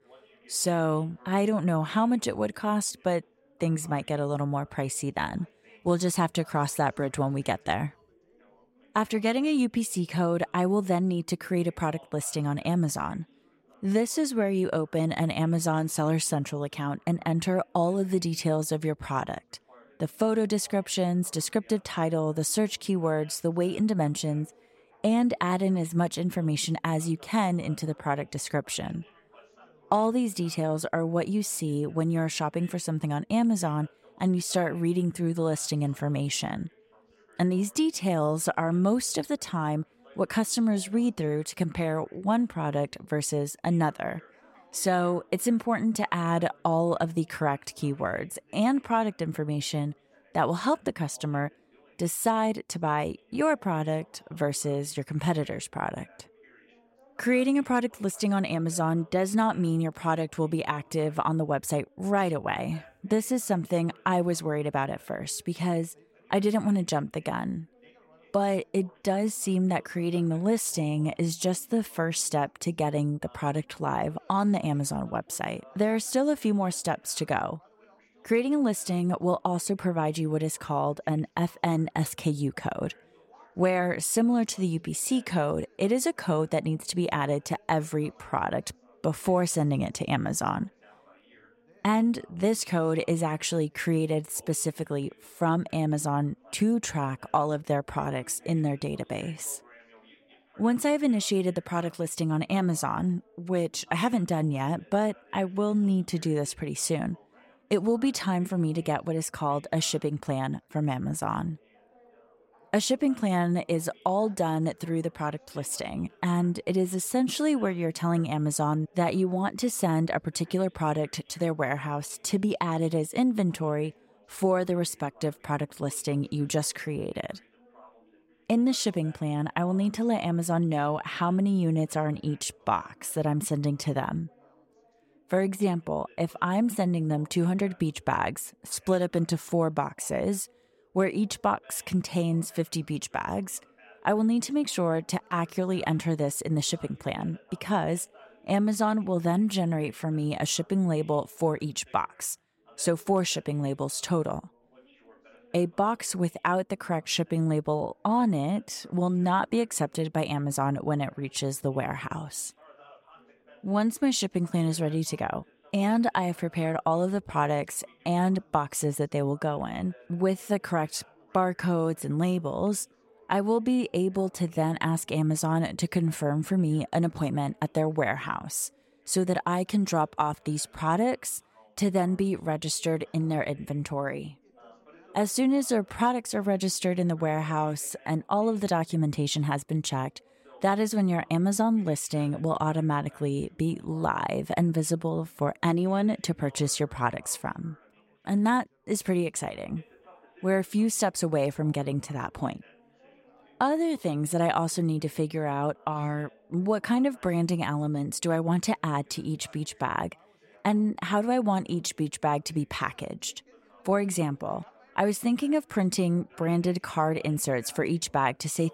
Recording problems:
background chatter; faint; throughout; 3 voices, 30 dB below the speech

